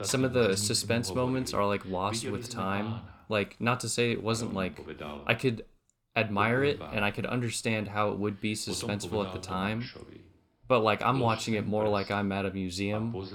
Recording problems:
voice in the background; noticeable; throughout; 10 dB below the speech

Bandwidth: 18 kHz